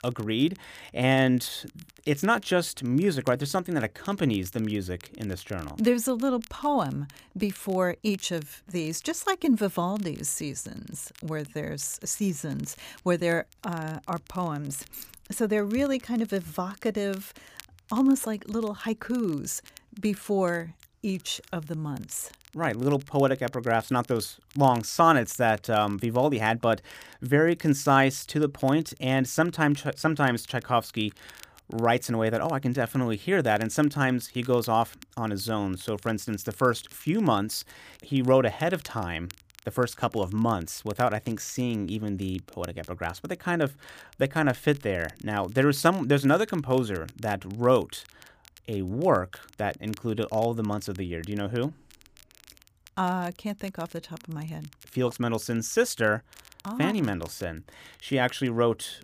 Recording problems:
crackle, like an old record; faint; 25 dB below the speech
jangling keys; faint; at 15 s; peak 15 dB below the speech

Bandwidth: 15 kHz